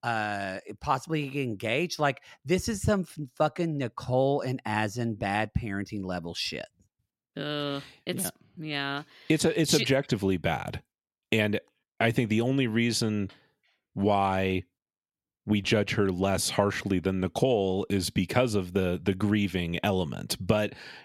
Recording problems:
none

